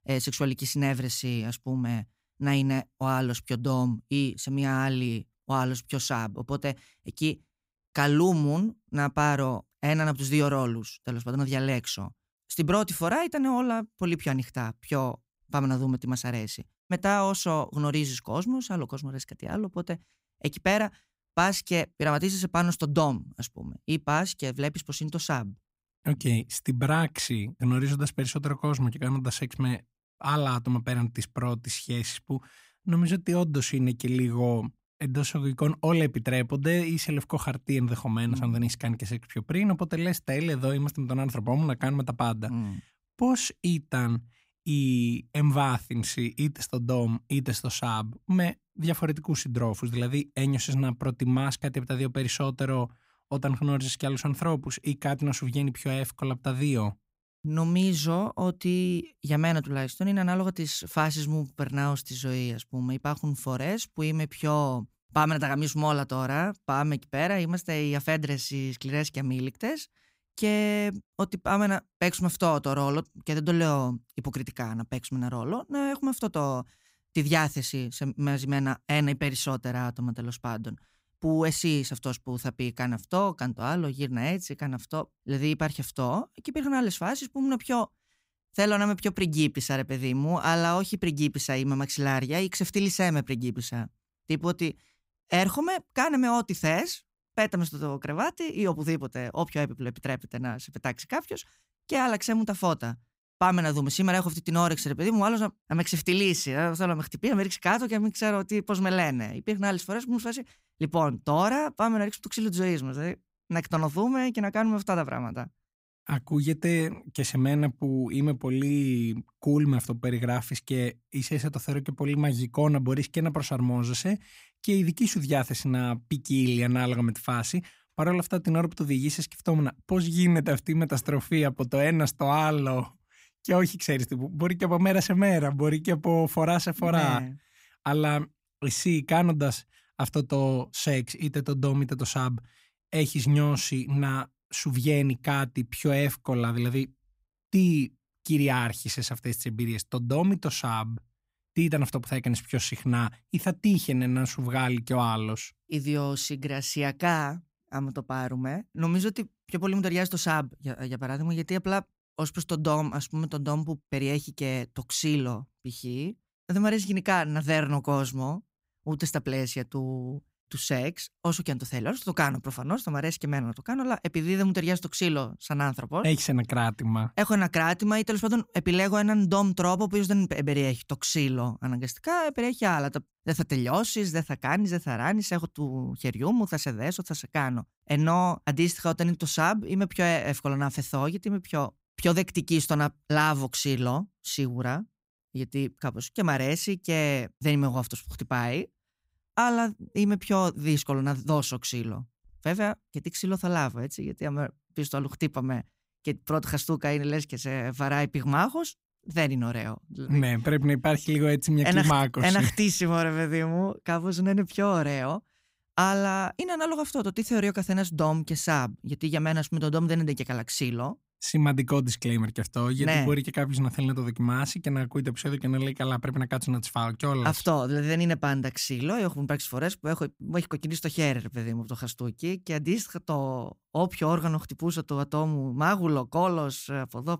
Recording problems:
none

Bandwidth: 15.5 kHz